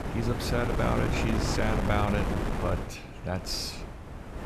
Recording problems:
wind noise on the microphone; heavy; 2 dB below the speech

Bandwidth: 14 kHz